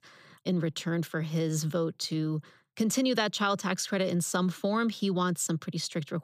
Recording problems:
none

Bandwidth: 15 kHz